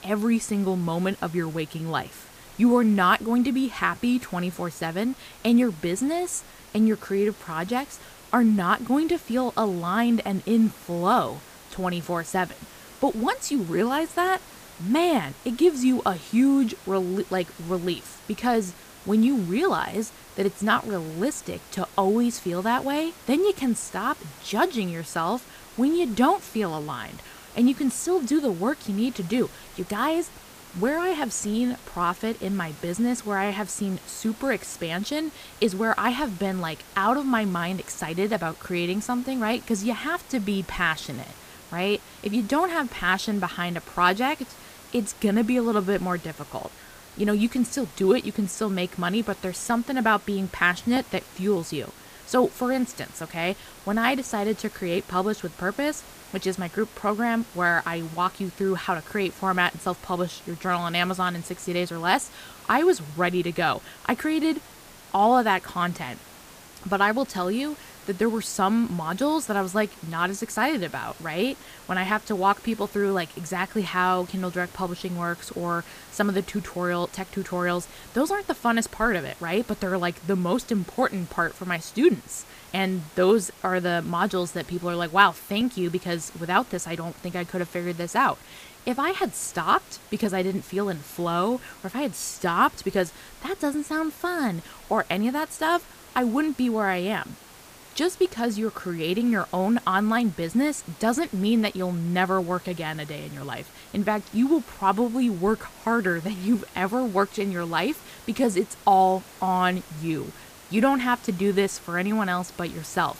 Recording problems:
hiss; noticeable; throughout; 20 dB below the speech

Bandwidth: 15 kHz